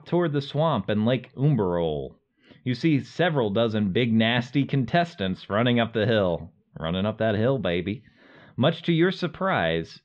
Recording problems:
muffled; slightly; fading above 3.5 kHz

